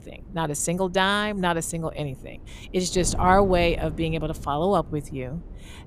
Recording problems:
wind noise on the microphone; occasional gusts; 25 dB below the speech

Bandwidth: 14.5 kHz